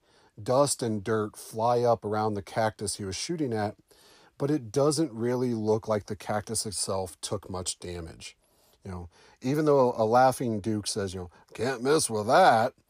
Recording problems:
none

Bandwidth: 15 kHz